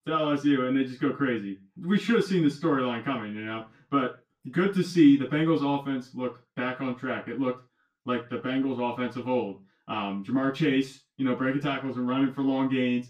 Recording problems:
off-mic speech; far
room echo; slight; dies away in 0.2 s

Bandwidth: 15 kHz